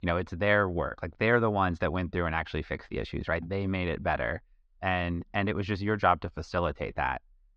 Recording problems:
muffled; very slightly; fading above 4.5 kHz

